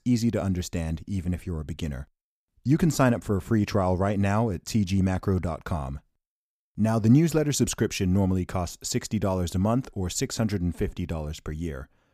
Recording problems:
none

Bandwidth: 15 kHz